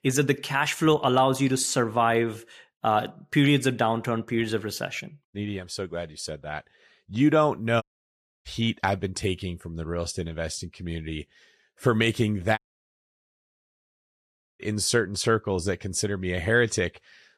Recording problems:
audio cutting out; at 8 s for 0.5 s and at 13 s for 2 s

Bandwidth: 14.5 kHz